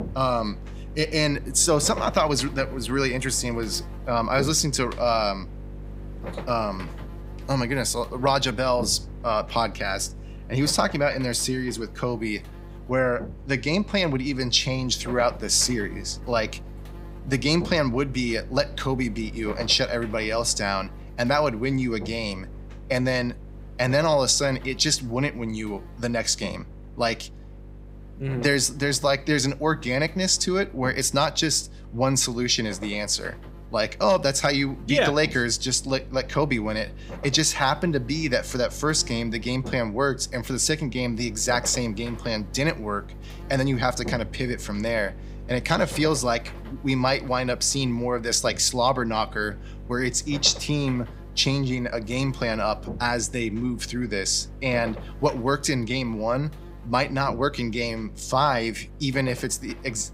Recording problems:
electrical hum; faint; throughout; 50 Hz, 20 dB below the speech

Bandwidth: 15.5 kHz